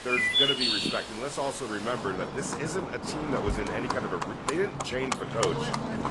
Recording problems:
garbled, watery; slightly; nothing above 10.5 kHz
animal sounds; very loud; throughout; 3 dB above the speech
wind noise on the microphone; occasional gusts; 20 dB below the speech

